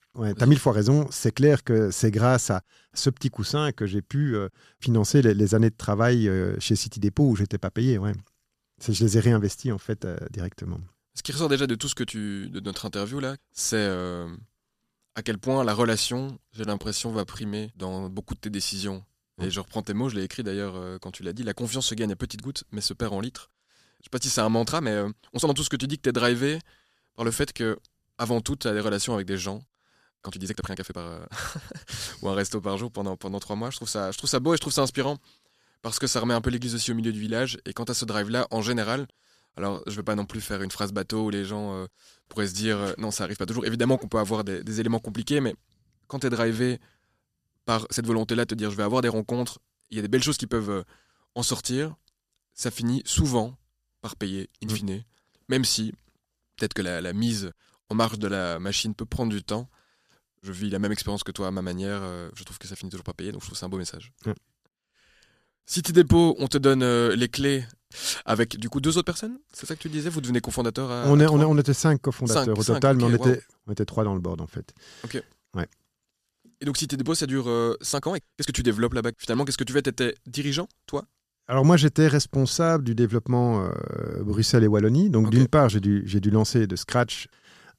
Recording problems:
uneven, jittery; strongly; from 17 s to 1:19

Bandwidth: 14.5 kHz